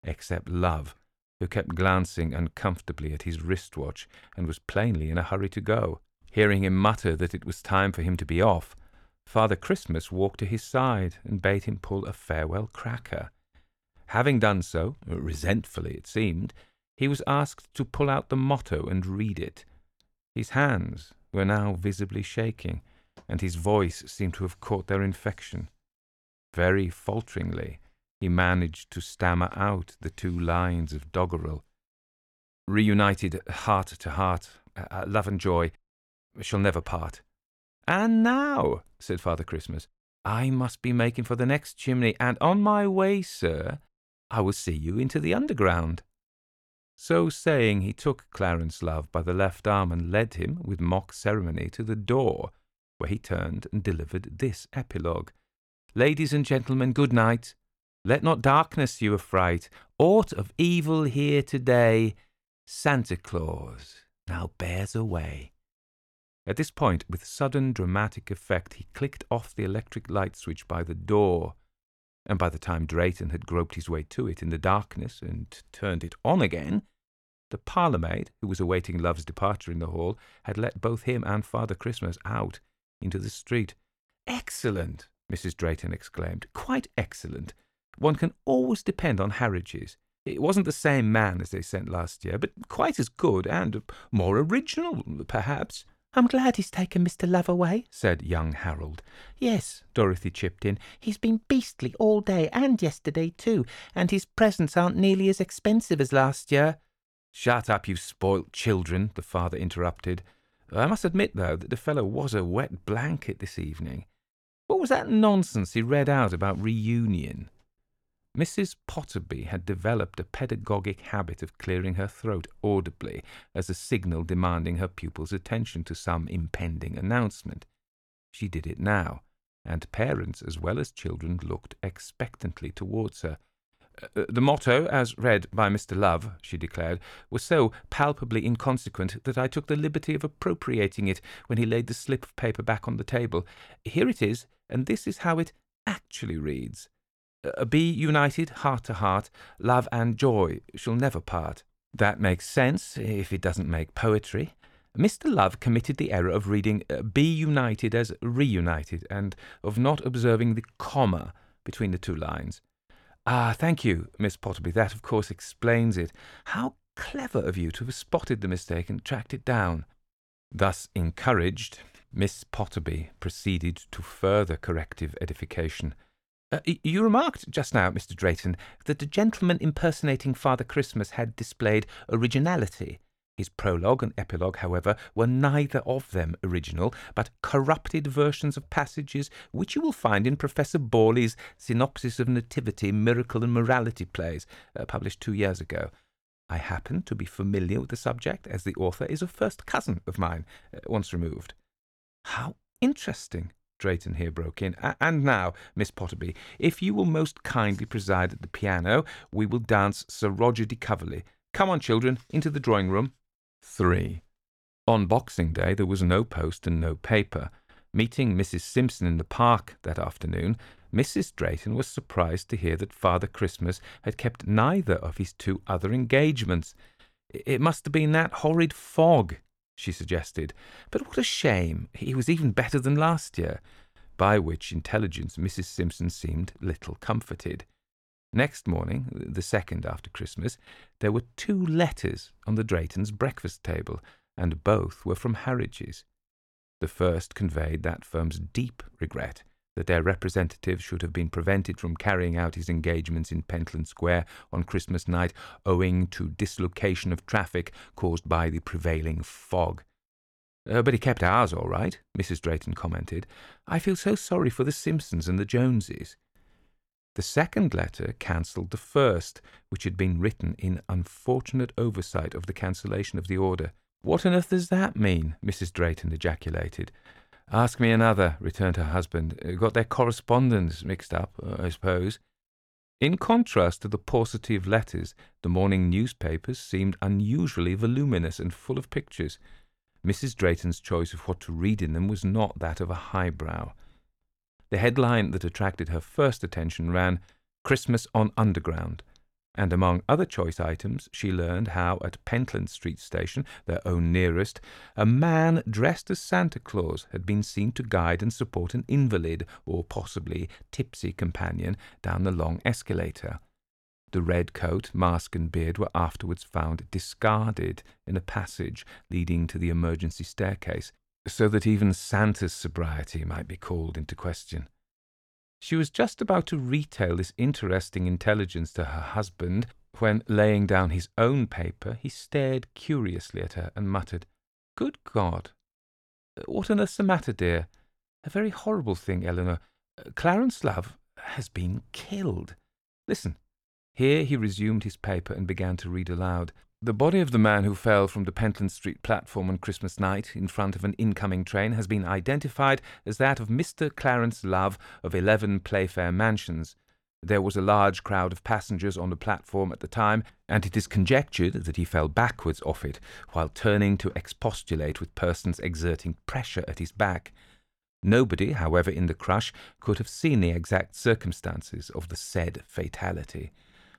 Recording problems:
none

